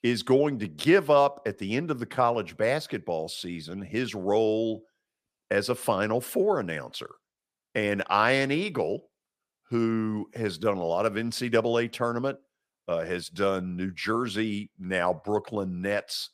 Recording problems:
none

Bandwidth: 15 kHz